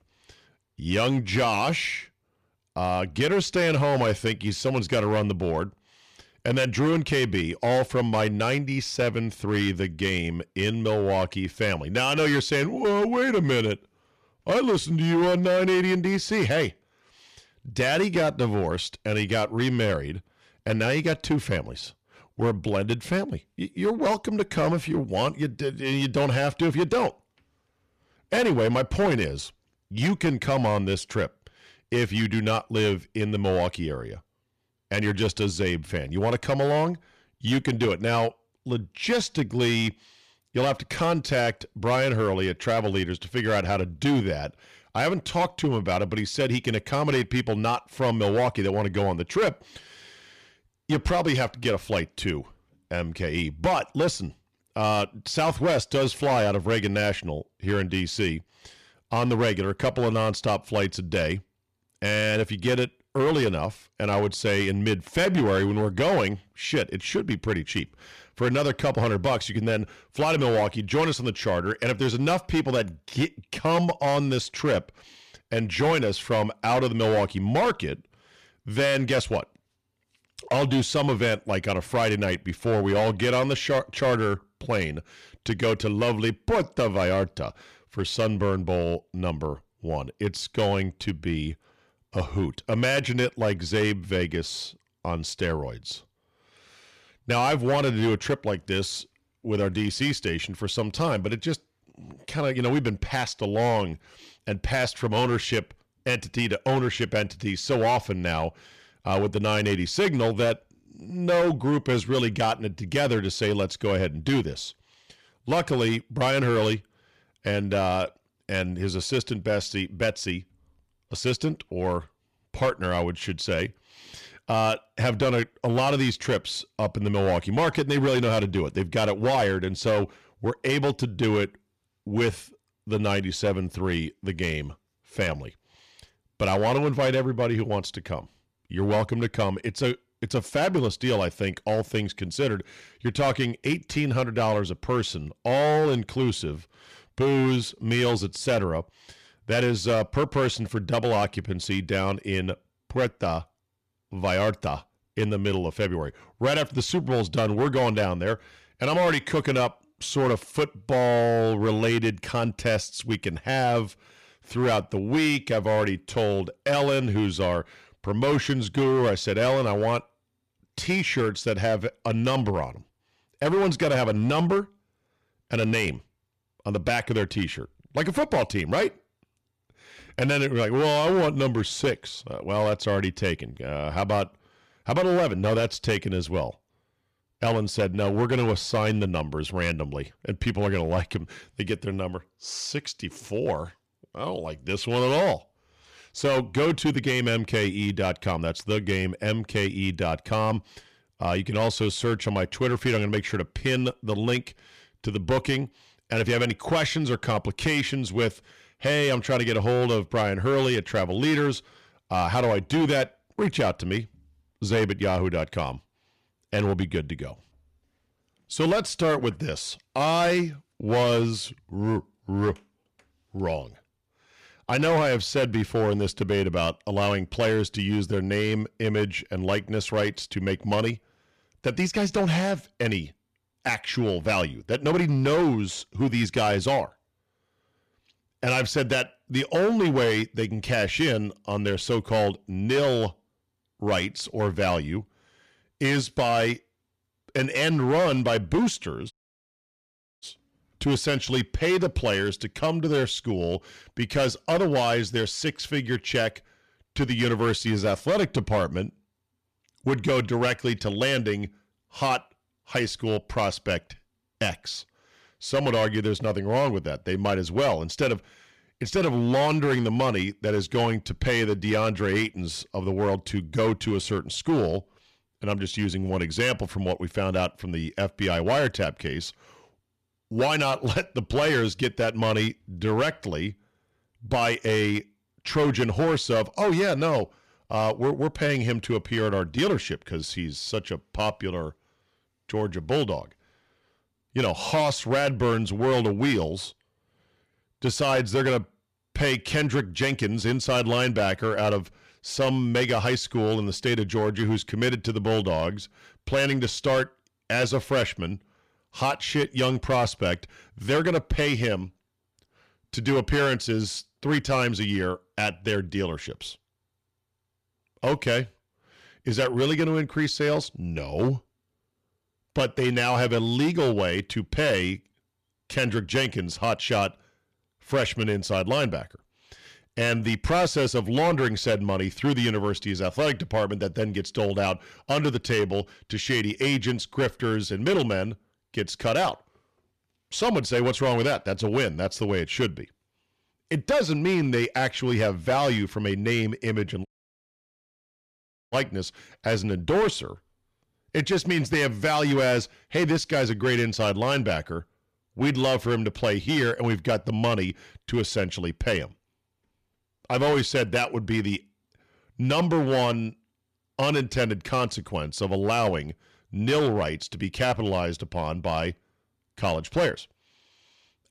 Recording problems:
distortion; slight; 8% of the sound clipped
audio cutting out; at 4:09 for 1 s and at 5:47 for 1.5 s

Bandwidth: 14.5 kHz